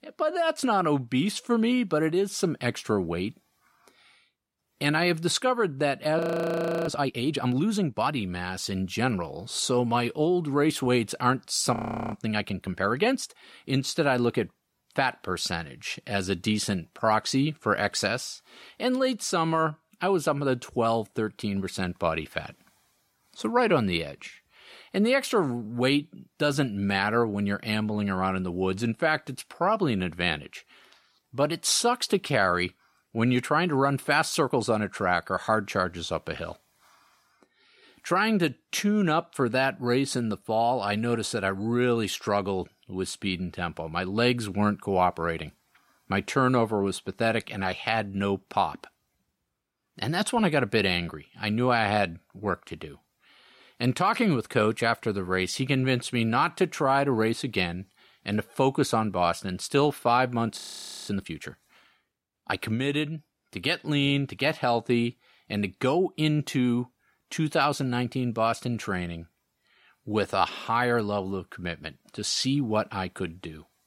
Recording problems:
audio freezing; at 6 s for 0.5 s, at 12 s and at 1:01 for 0.5 s

